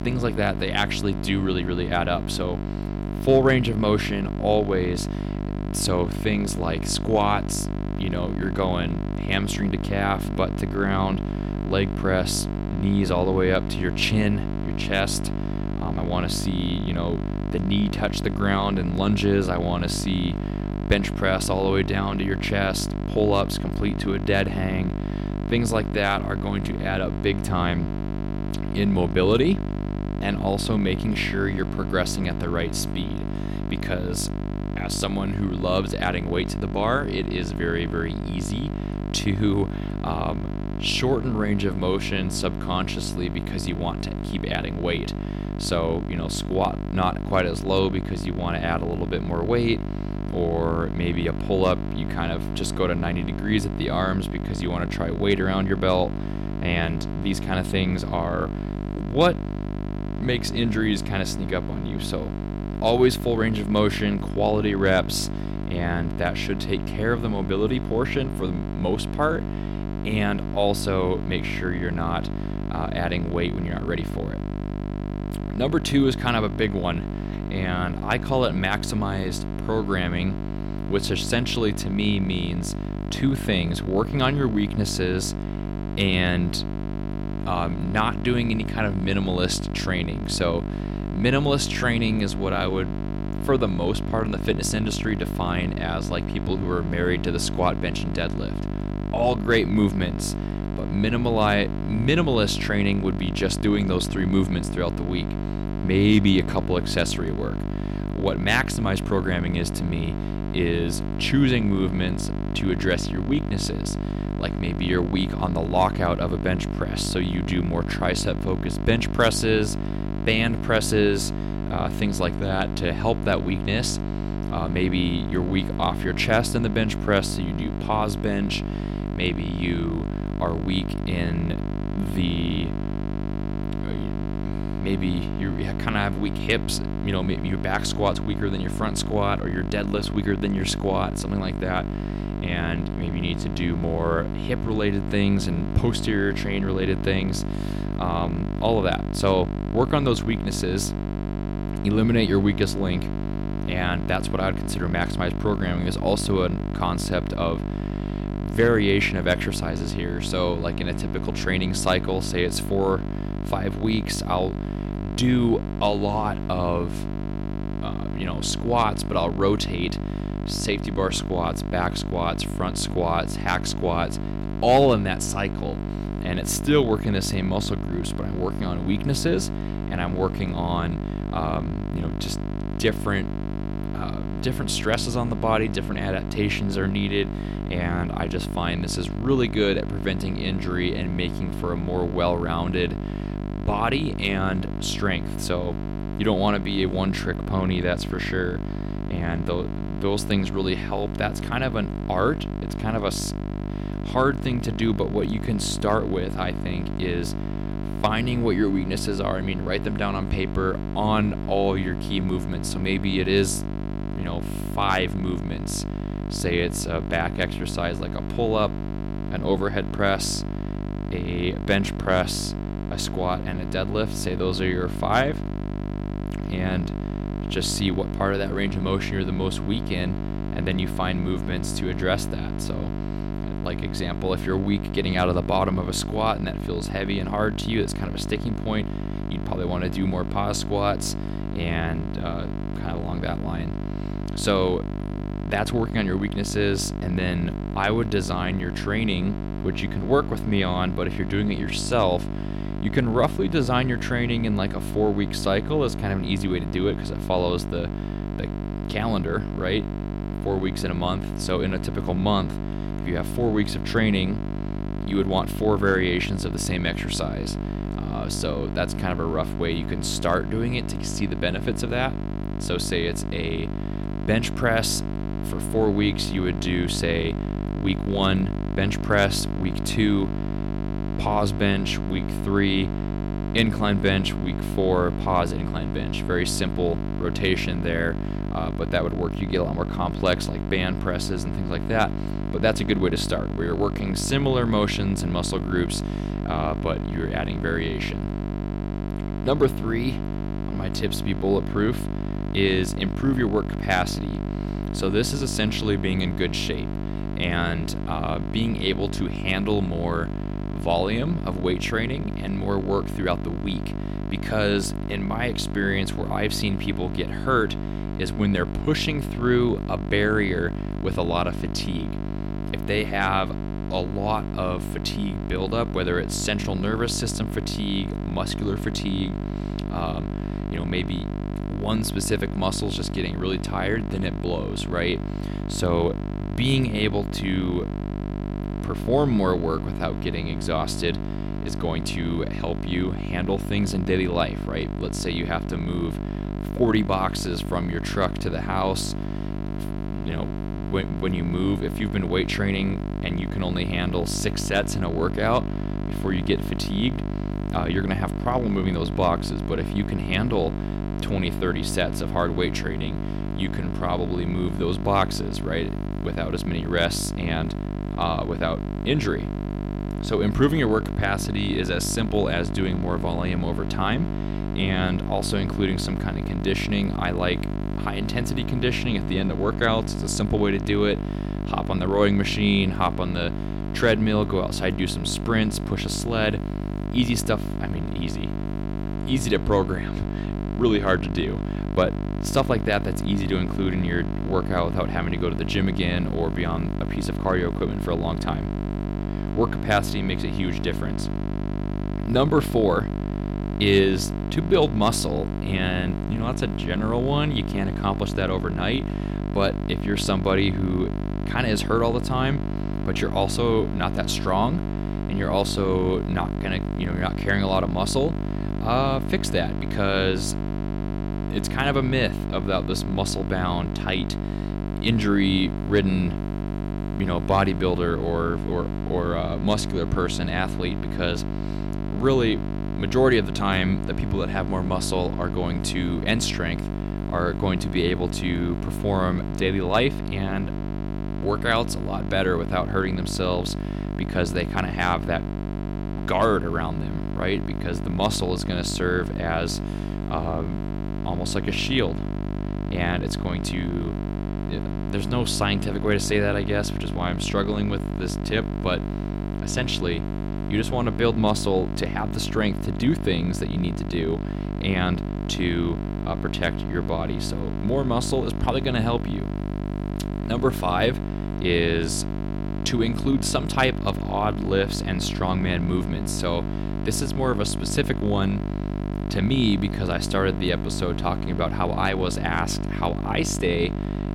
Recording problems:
electrical hum; loud; throughout; 50 Hz, 9 dB below the speech

